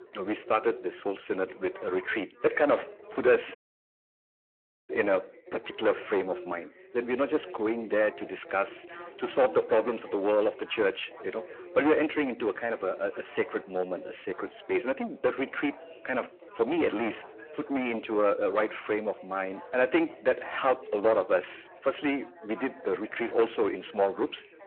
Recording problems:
distortion; heavy; 9 dB below the speech
phone-call audio
background chatter; noticeable; throughout; 3 voices, 15 dB below the speech
audio cutting out; at 3.5 s for 1.5 s

